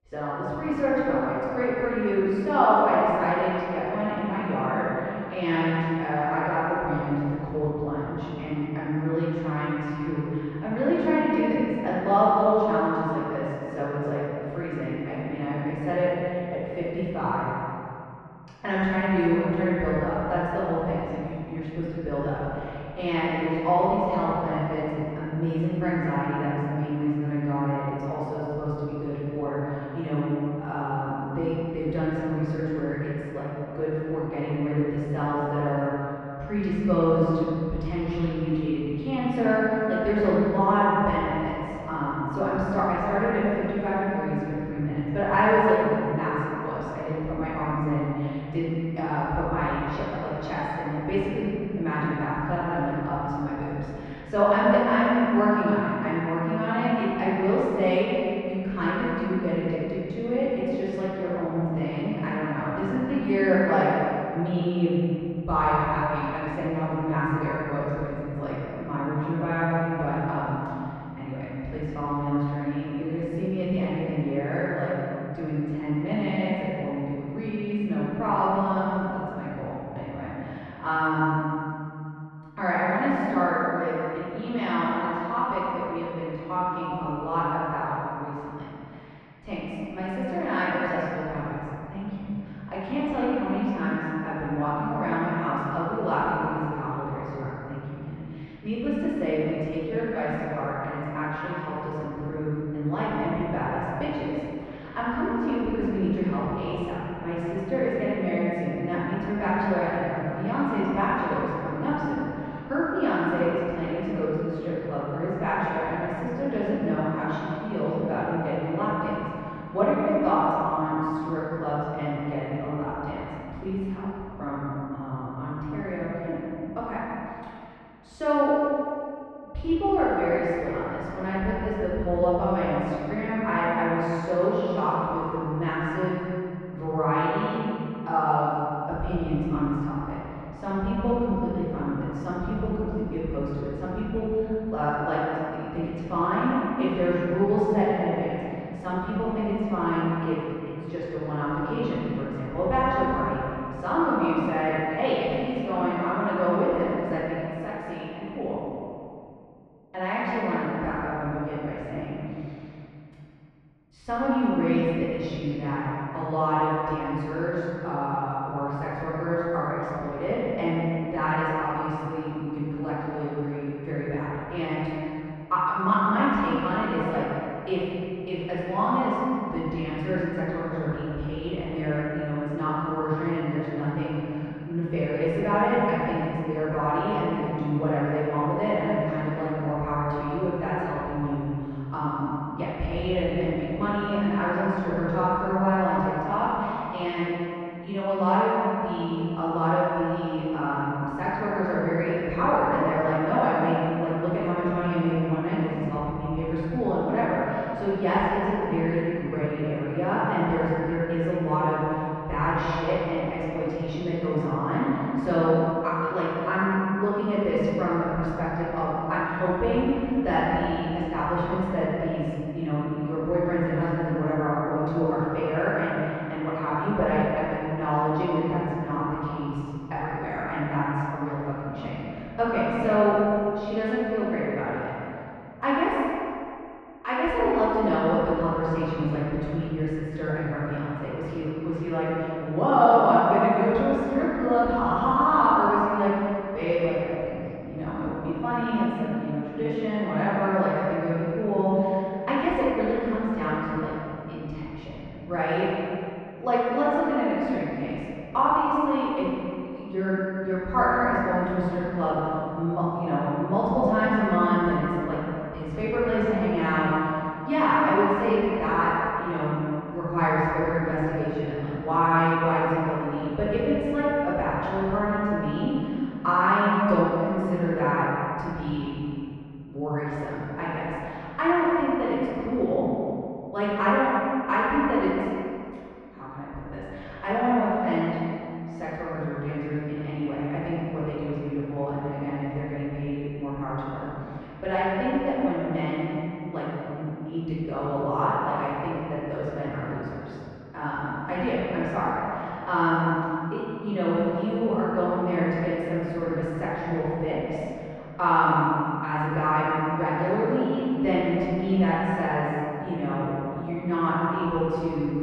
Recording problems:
room echo; strong; dies away in 2.5 s
off-mic speech; far
muffled; very; fading above 1.5 kHz

